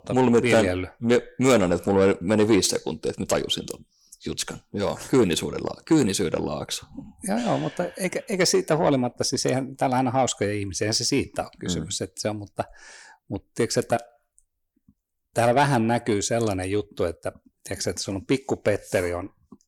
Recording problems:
distortion; slight; 10 dB below the speech

